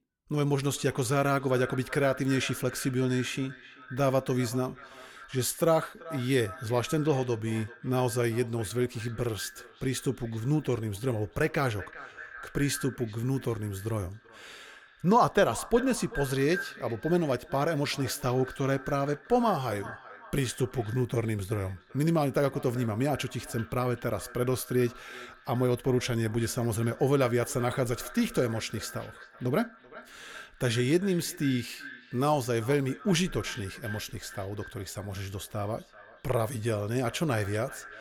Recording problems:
echo of what is said; noticeable; throughout; 390 ms later, 15 dB below the speech

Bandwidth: 17.5 kHz